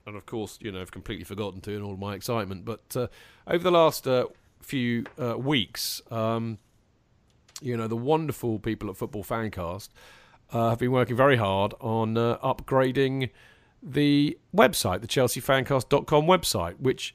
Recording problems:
none

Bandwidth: 15 kHz